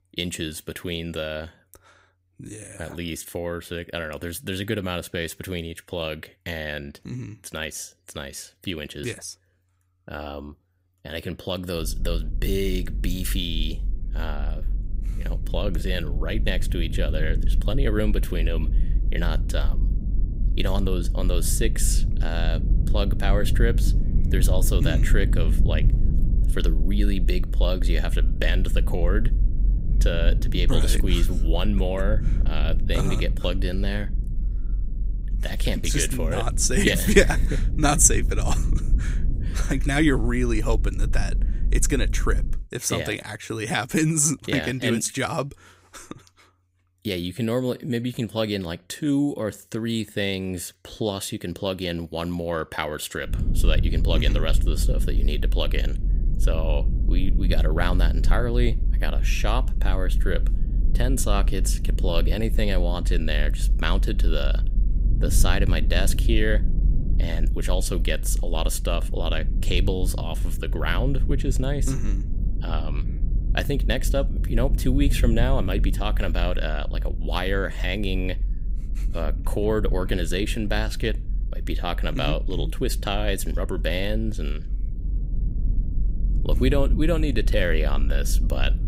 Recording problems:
low rumble; noticeable; from 12 to 43 s and from 53 s on; 15 dB below the speech

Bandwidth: 15.5 kHz